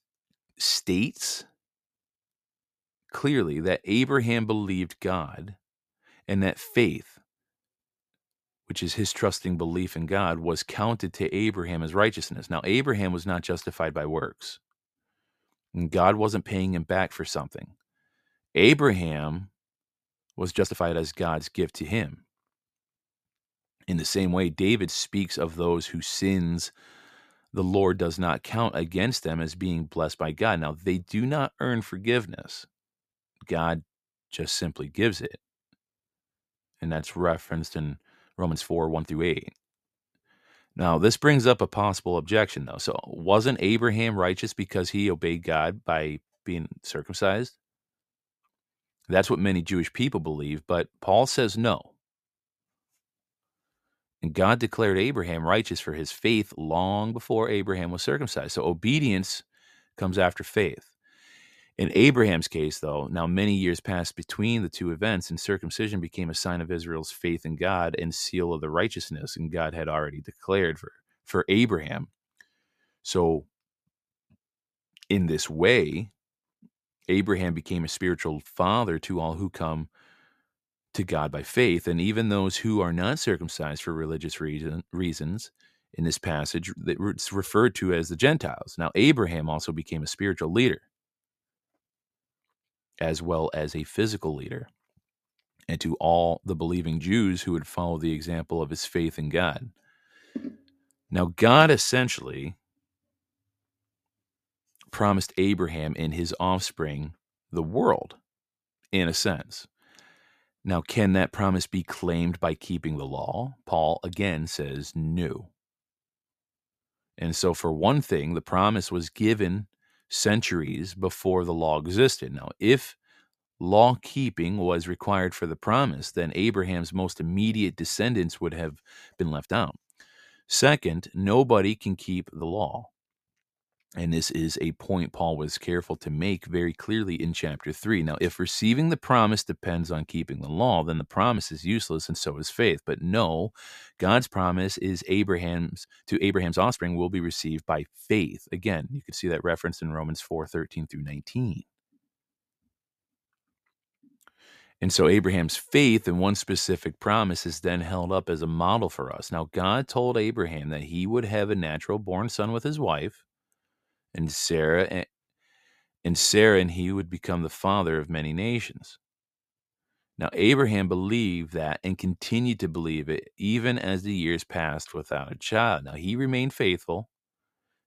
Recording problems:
uneven, jittery; strongly; from 11 s to 2:56

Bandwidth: 14.5 kHz